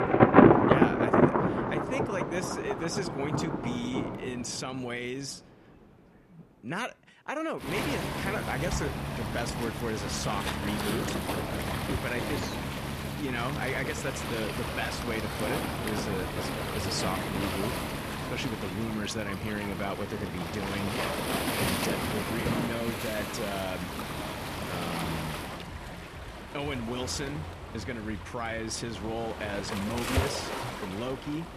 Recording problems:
rain or running water; very loud; throughout; 5 dB above the speech

